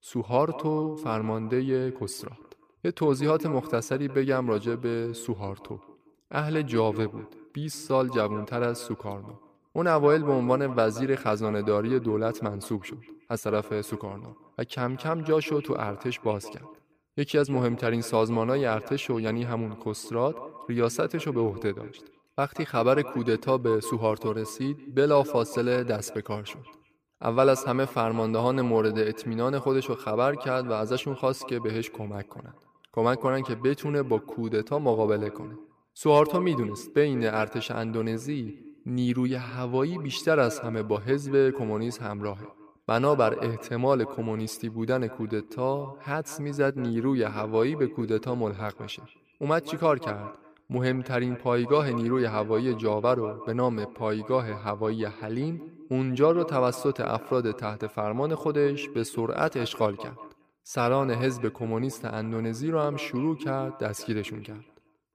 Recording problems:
echo of what is said; noticeable; throughout; 180 ms later, 15 dB below the speech

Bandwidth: 15 kHz